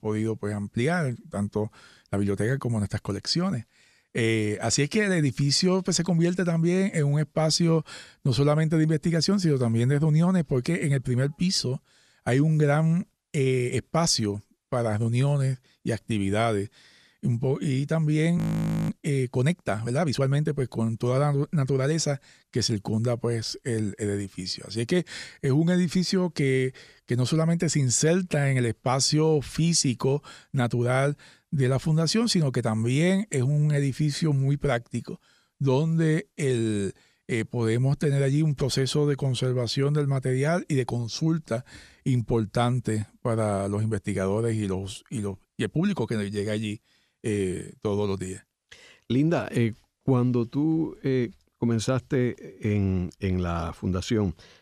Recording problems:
audio freezing; at 18 s for 0.5 s

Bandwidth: 14.5 kHz